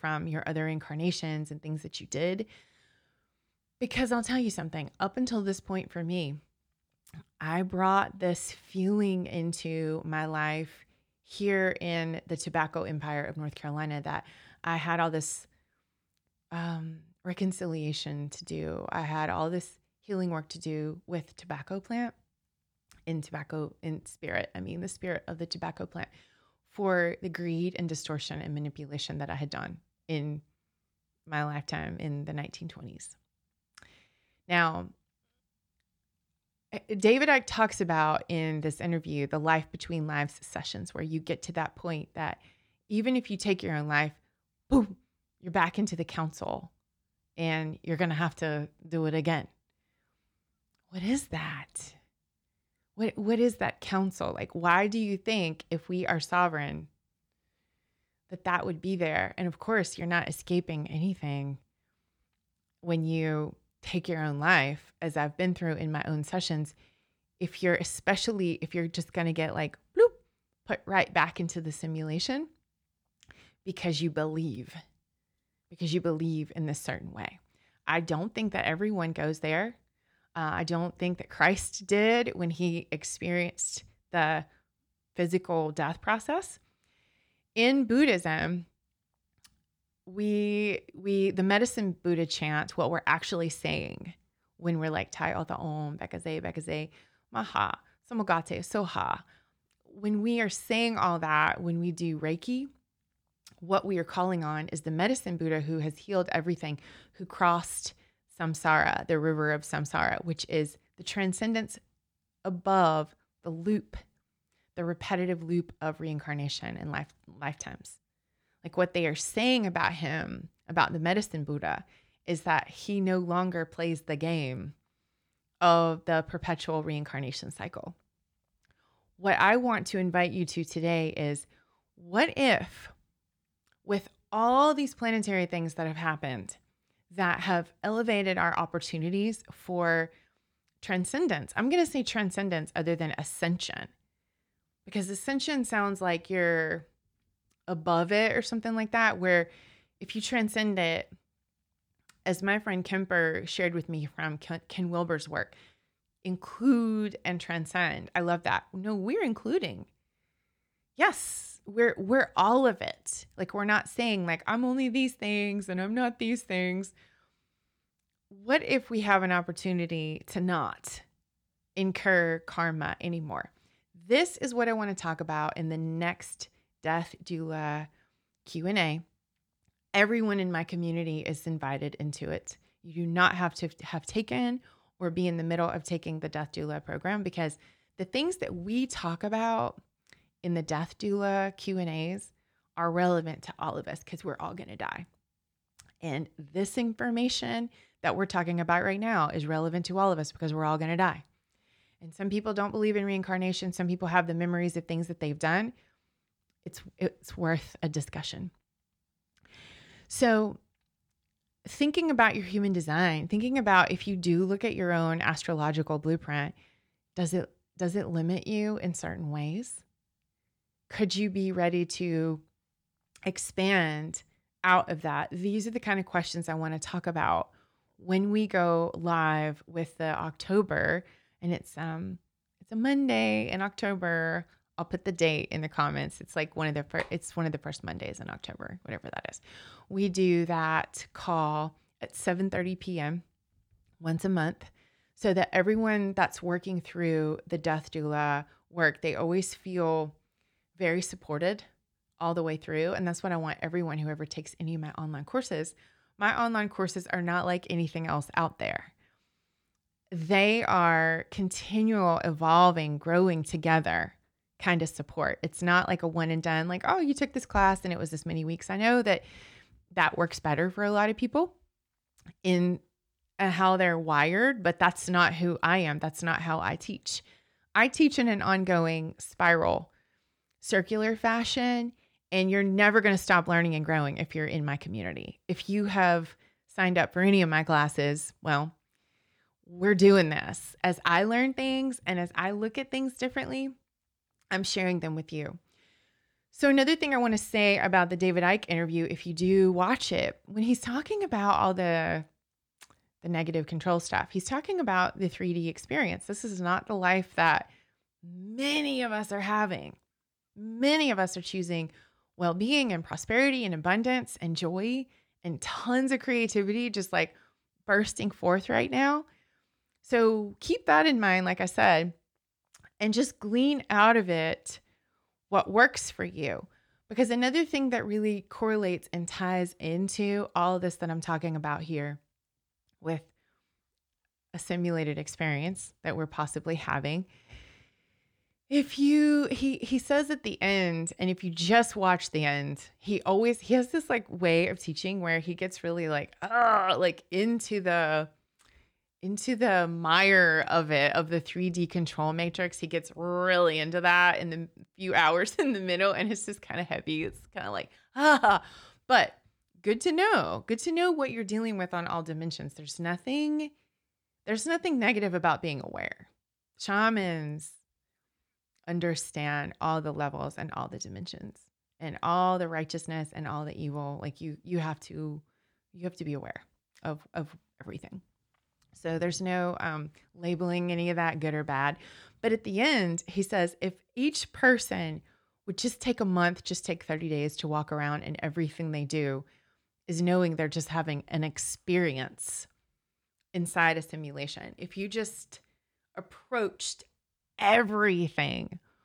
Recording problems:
none

